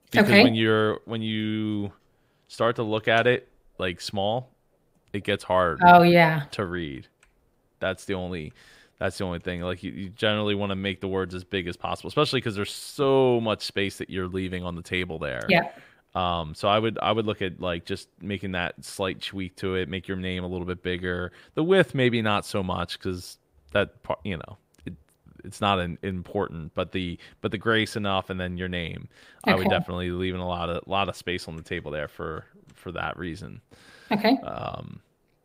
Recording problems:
none

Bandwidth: 15.5 kHz